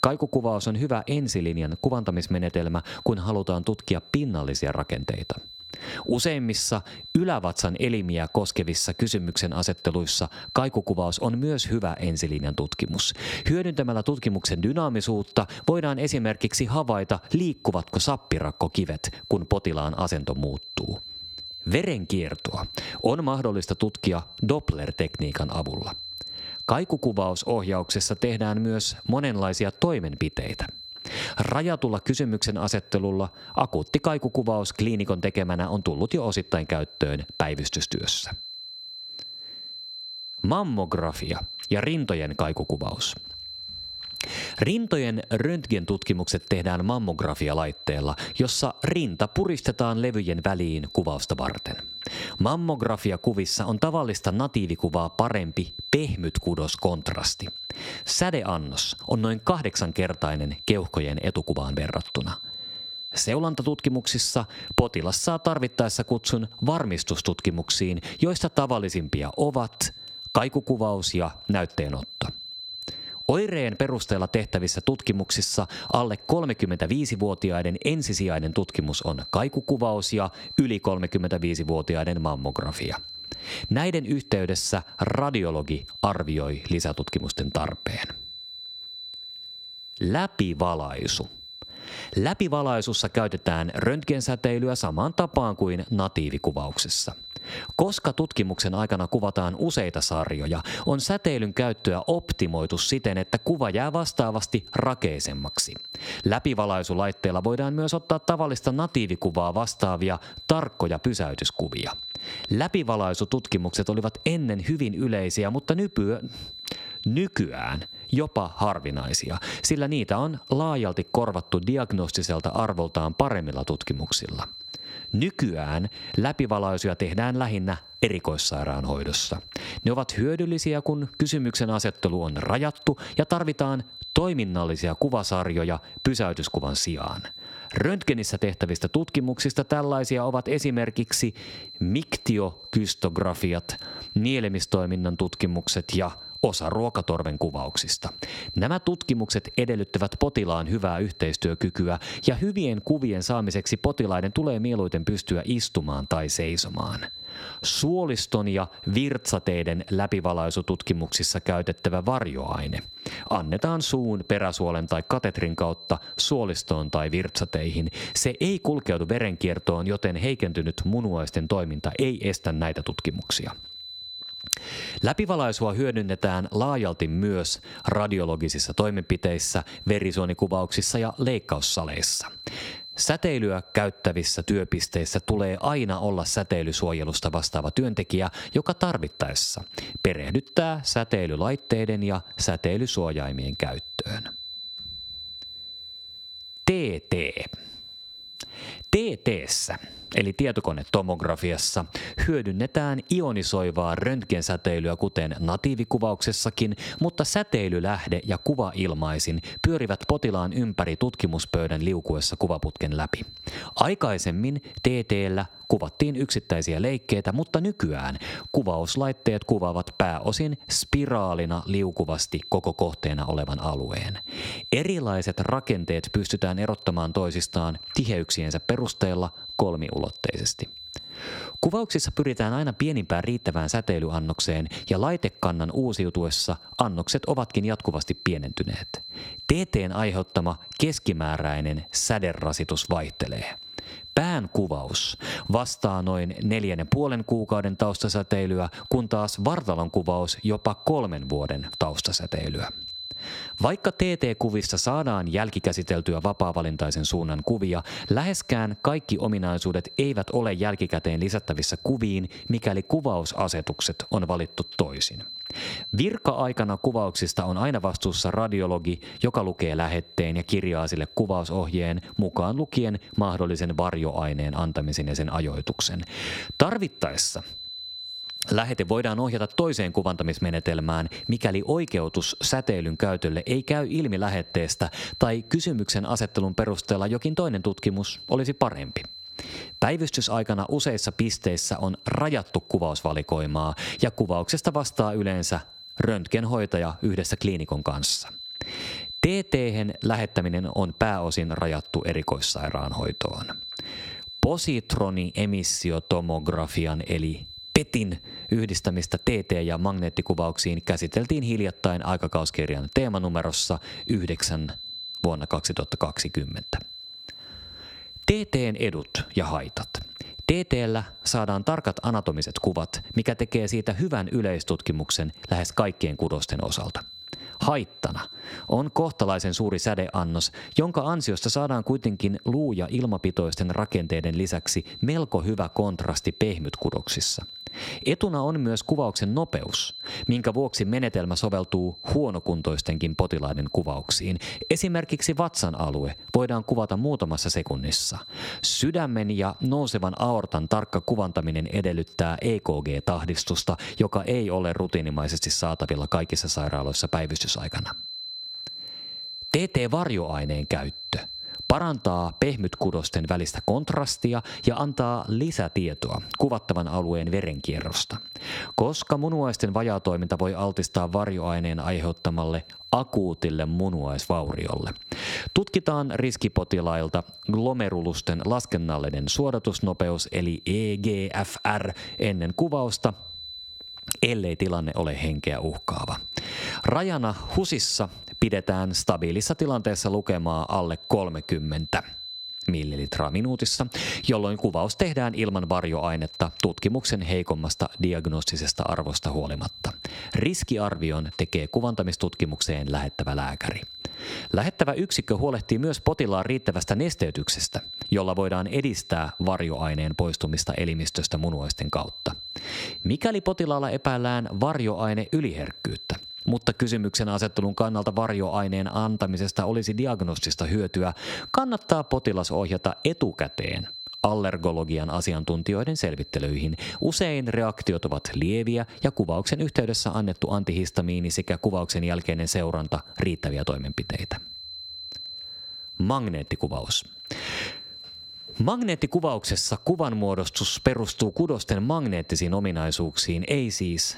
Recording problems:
squashed, flat; somewhat
high-pitched whine; noticeable; throughout; 4 kHz, 15 dB below the speech

